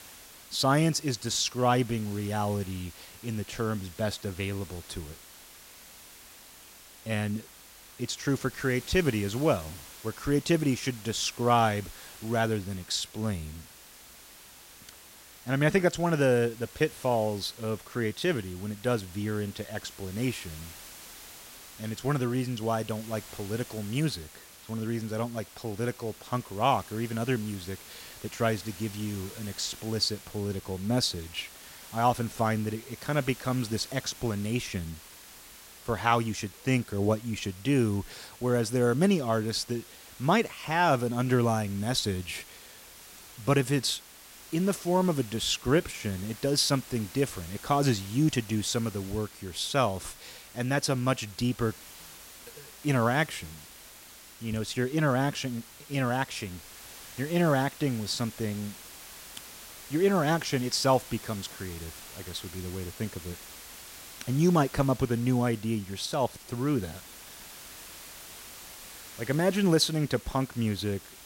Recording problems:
hiss; noticeable; throughout; 15 dB below the speech

